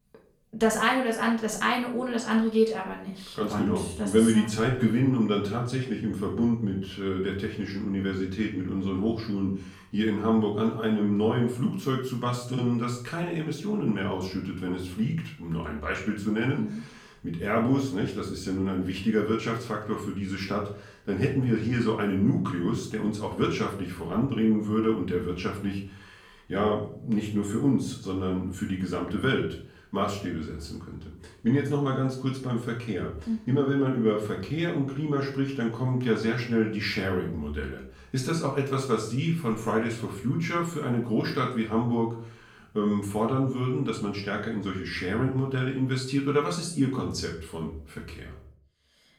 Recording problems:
off-mic speech; far
room echo; slight; dies away in 0.4 s

